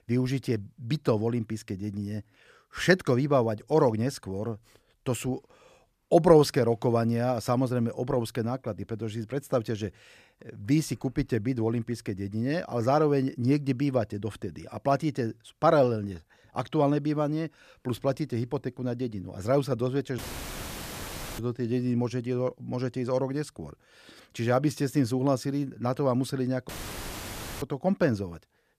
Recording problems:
audio cutting out; filled with static; at 20 s for 1 s and at 27 s for 1 s

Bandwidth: 14.5 kHz